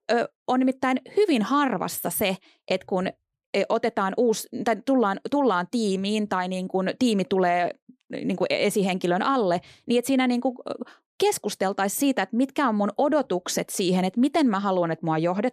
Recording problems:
none

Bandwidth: 14.5 kHz